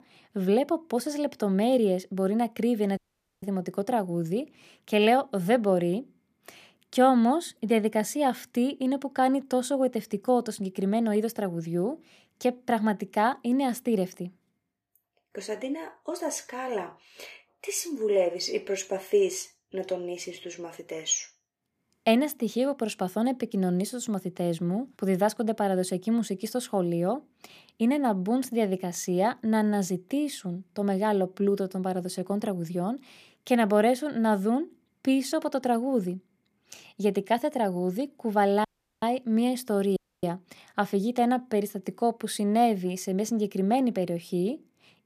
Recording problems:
audio cutting out; at 3 s, at 39 s and at 40 s

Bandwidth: 14.5 kHz